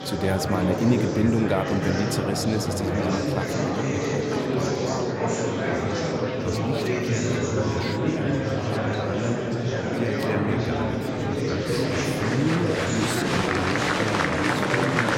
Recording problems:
murmuring crowd; very loud; throughout; 4 dB above the speech

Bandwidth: 16 kHz